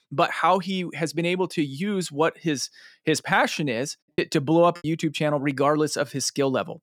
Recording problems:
choppy; occasionally; at 4 s; 3% of the speech affected

